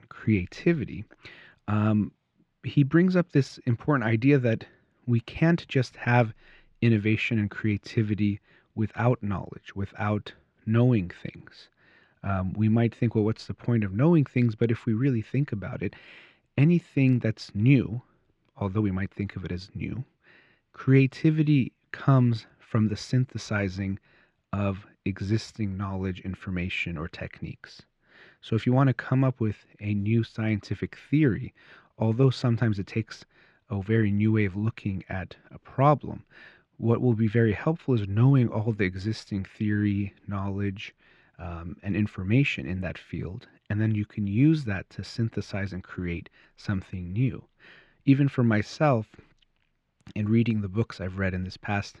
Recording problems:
muffled; slightly; fading above 2.5 kHz

